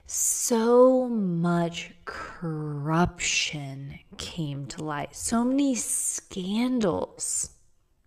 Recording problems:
wrong speed, natural pitch; too slow; 0.6 times normal speed

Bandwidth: 14.5 kHz